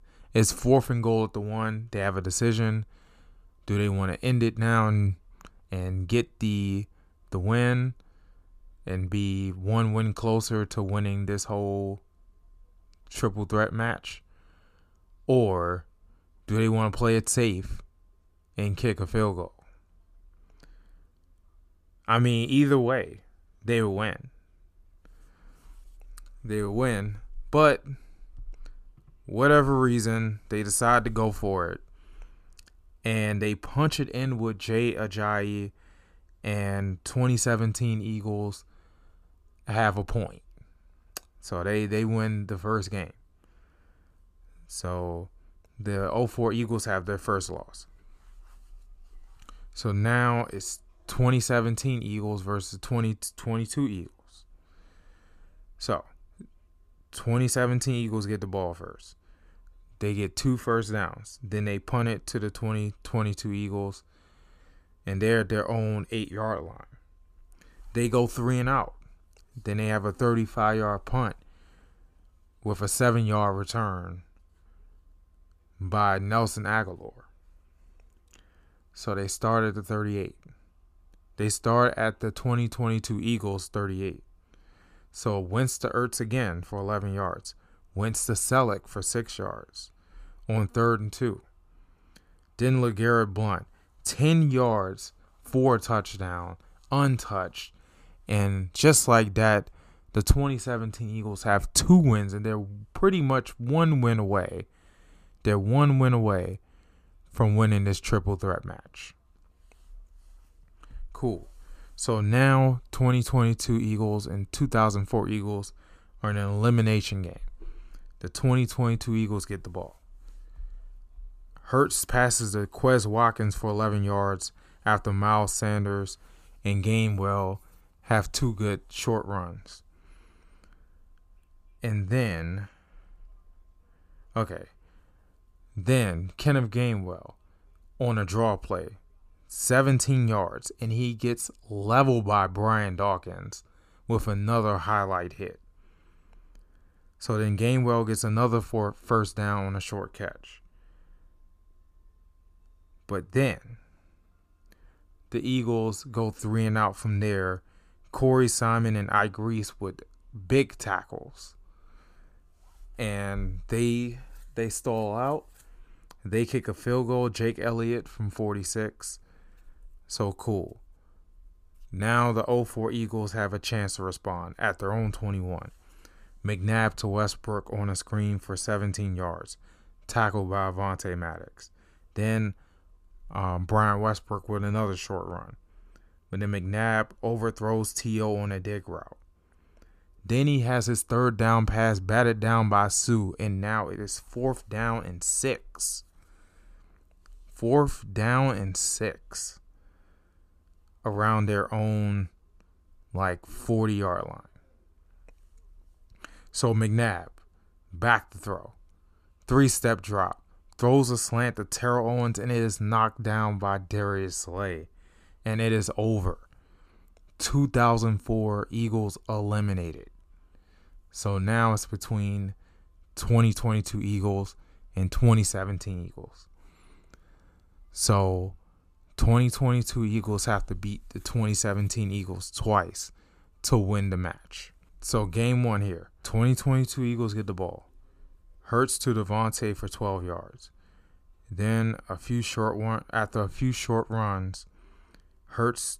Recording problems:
none

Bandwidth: 14.5 kHz